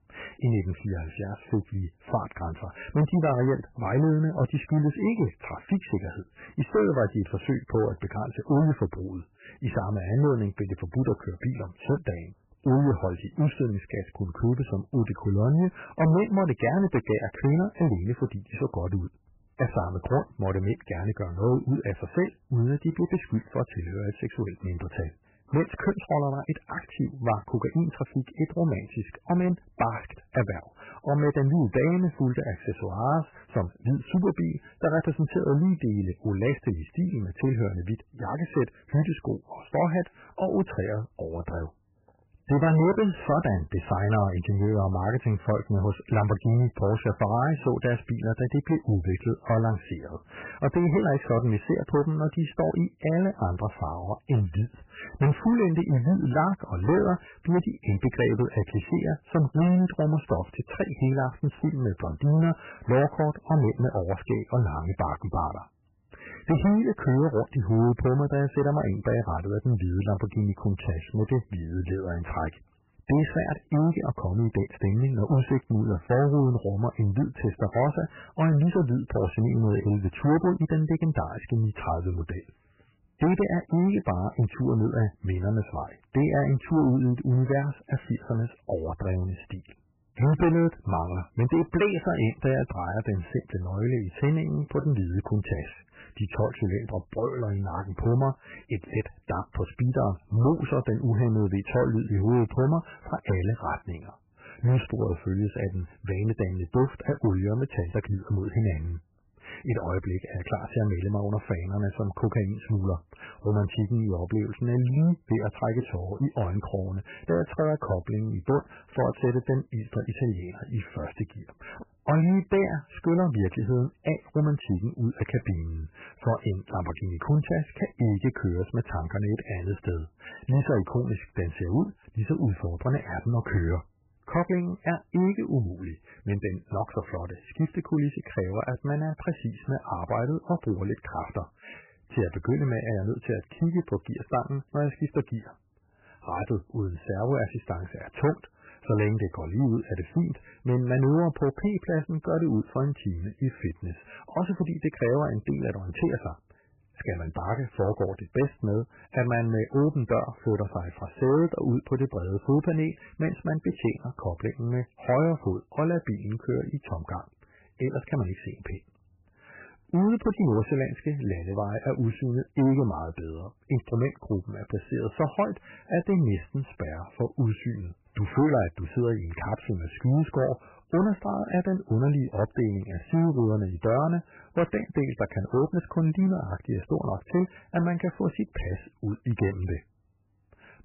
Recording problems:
garbled, watery; badly; nothing above 3 kHz
distortion; slight; 5% of the sound clipped

